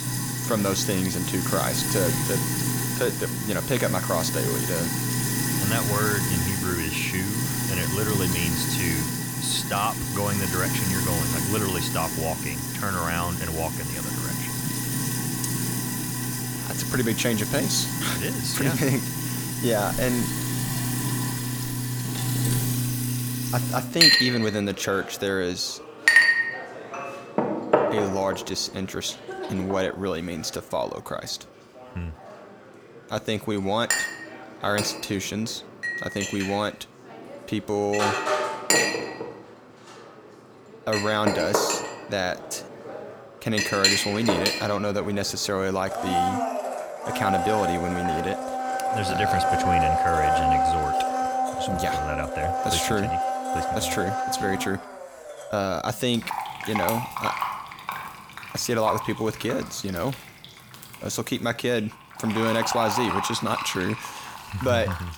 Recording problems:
household noises; very loud; throughout; 2 dB above the speech

